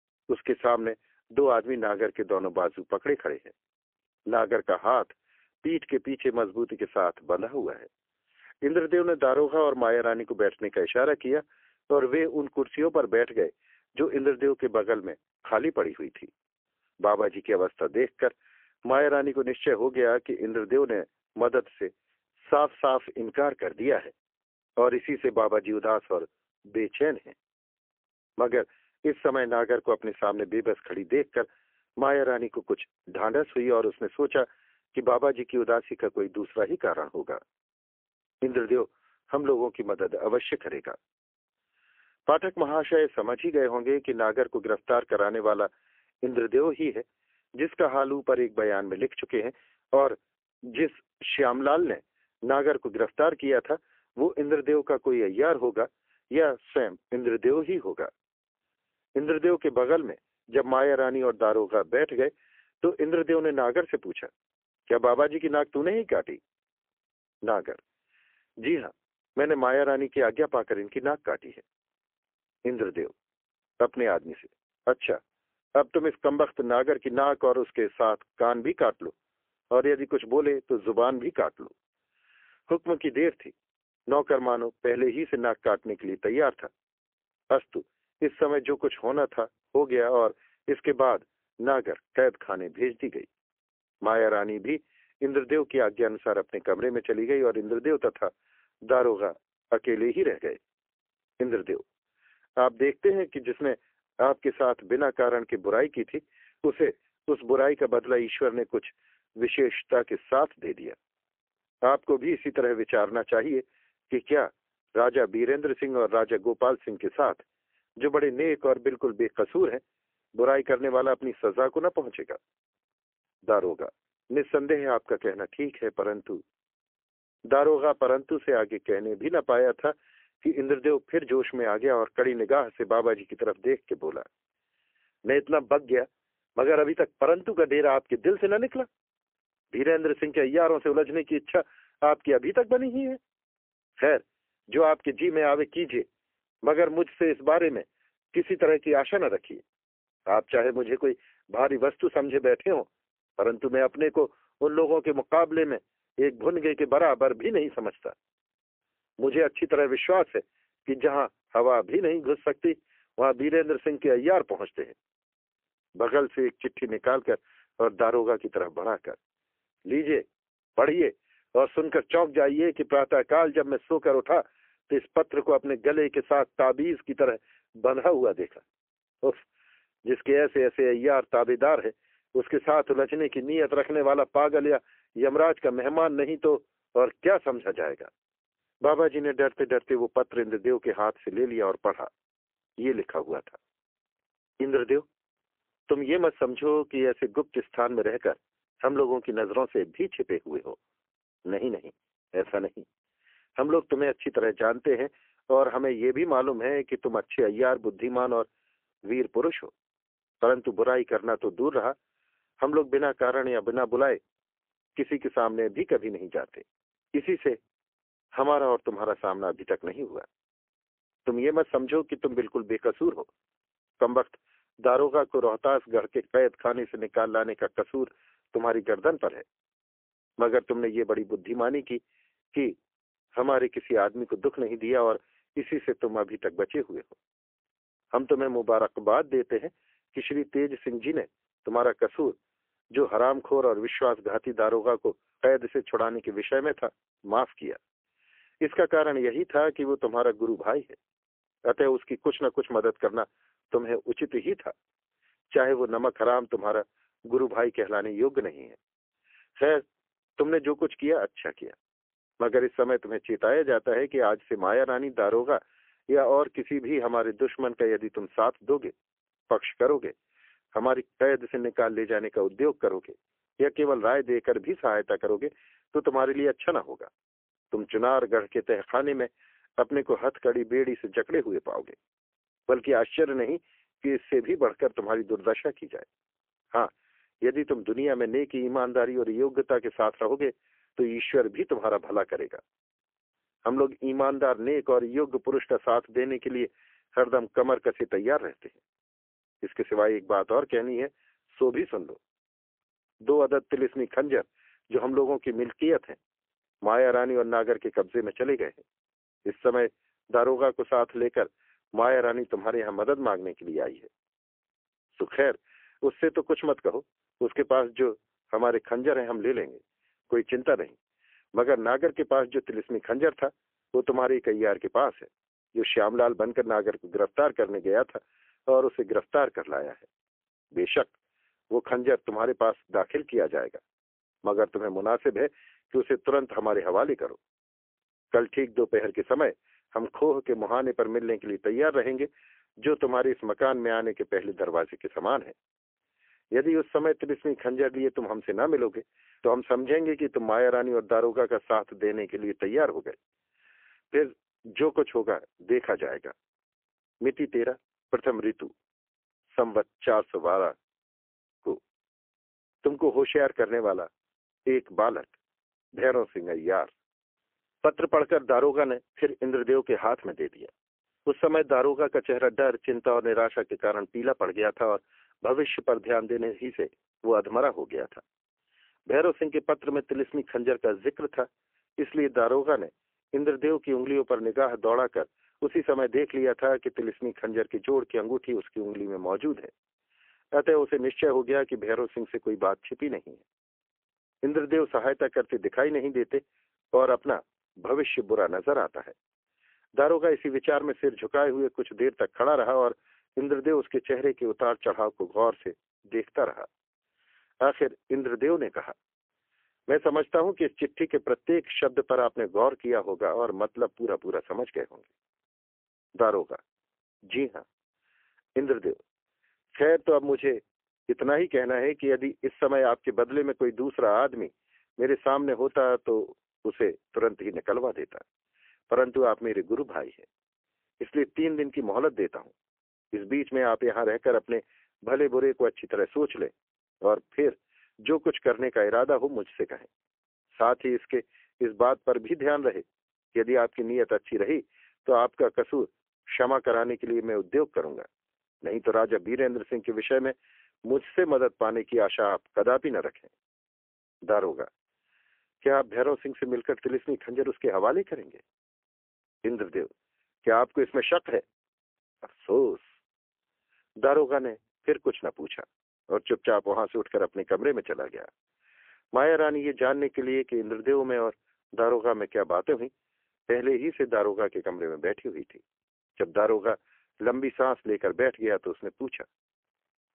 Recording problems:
phone-call audio; poor line; nothing above 3 kHz

